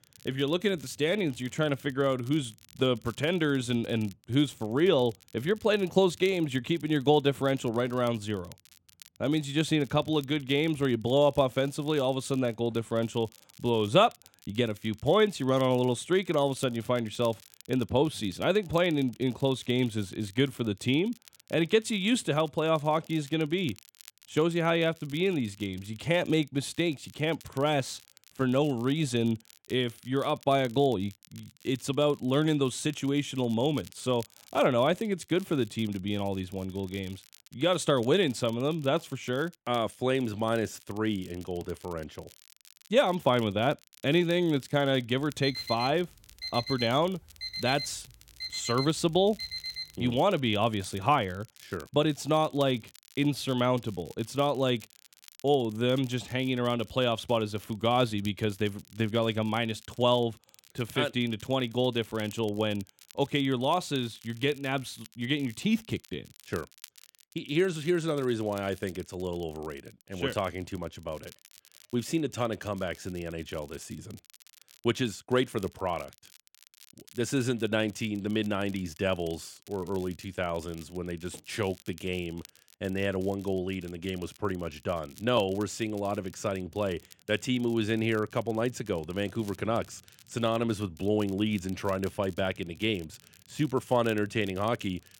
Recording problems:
crackle, like an old record; faint; 25 dB below the speech
alarm; noticeable; from 45 to 50 s; peak 5 dB below the speech

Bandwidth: 16.5 kHz